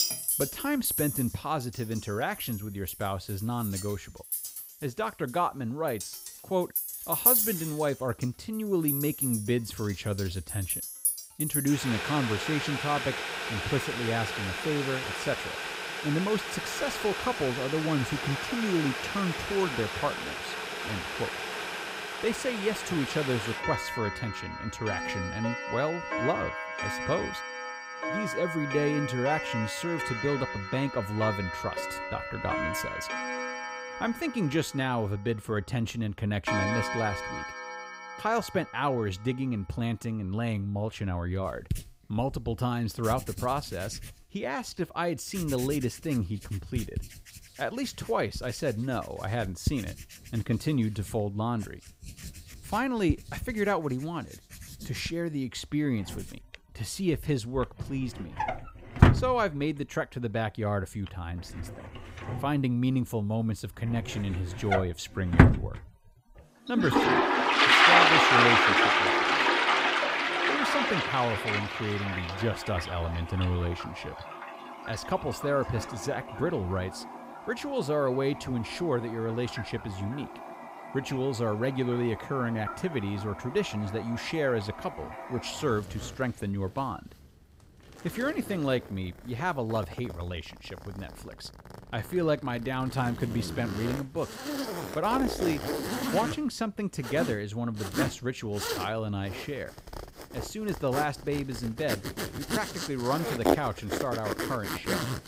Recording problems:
household noises; very loud; throughout; 2 dB above the speech

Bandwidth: 15.5 kHz